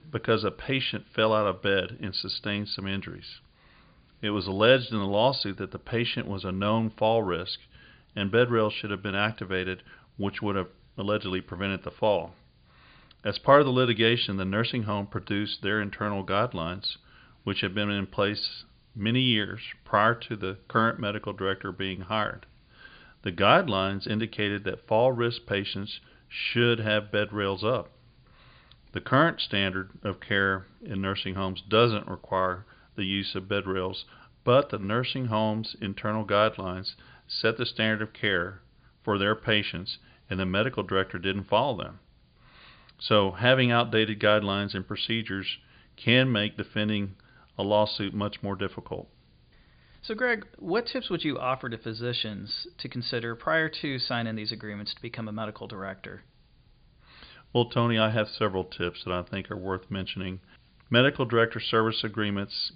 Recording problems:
high frequencies cut off; severe; nothing above 5 kHz
hiss; very faint; throughout; 40 dB below the speech

